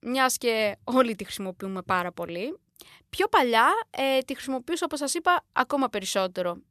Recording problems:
none

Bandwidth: 13.5 kHz